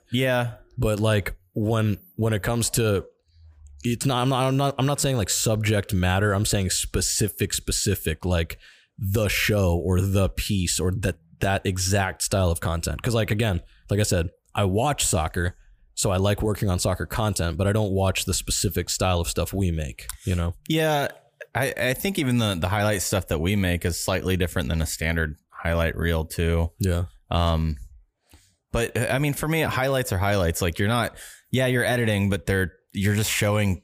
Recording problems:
none

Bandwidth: 15 kHz